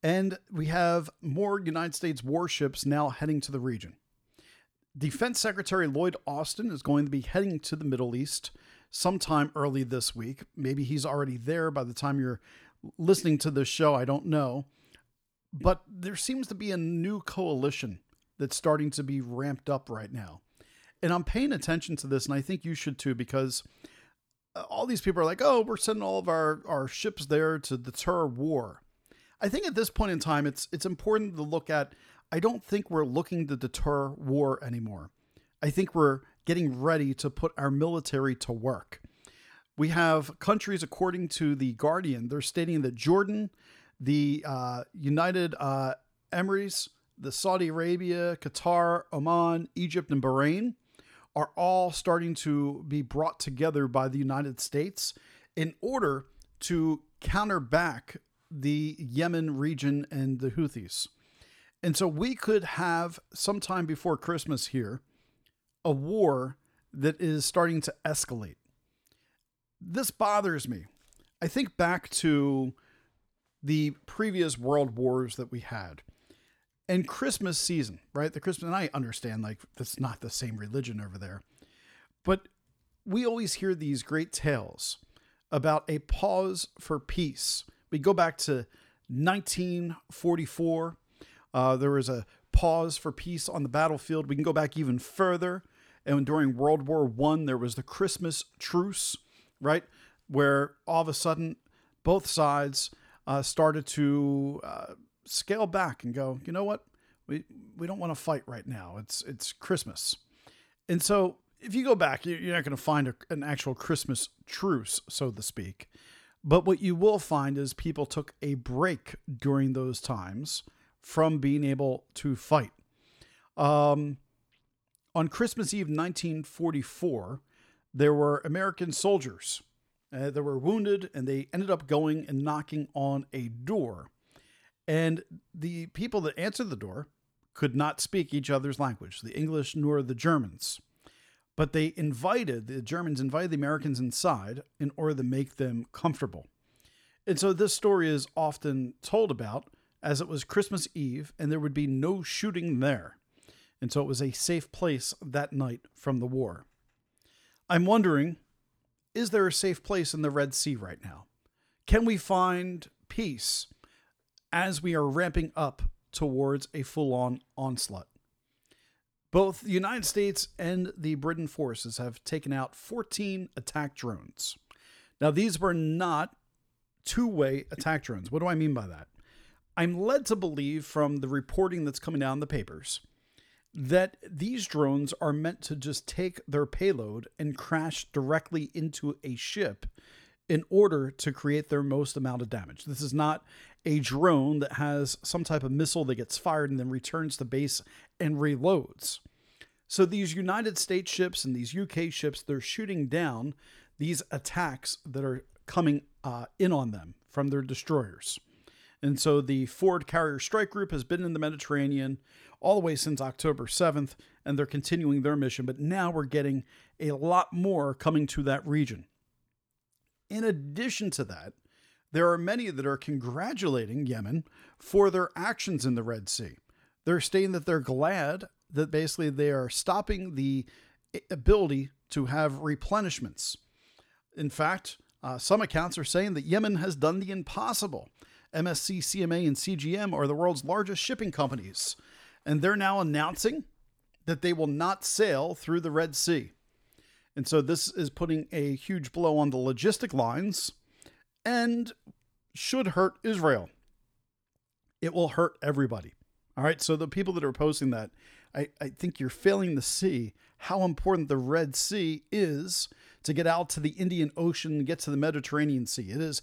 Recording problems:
none

